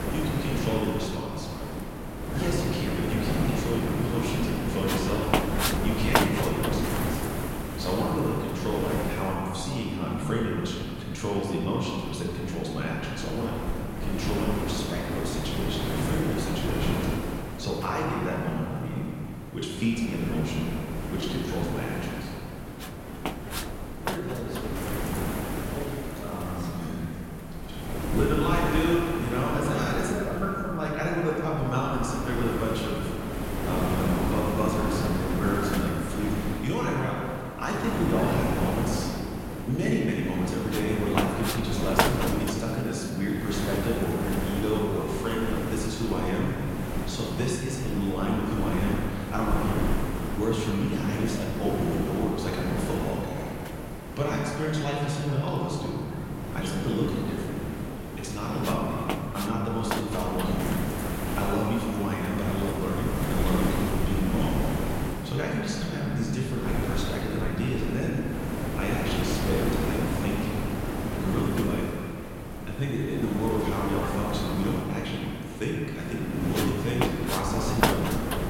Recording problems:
off-mic speech; far
room echo; noticeable; dies away in 2.2 s
wind noise on the microphone; heavy; 2 dB below the speech

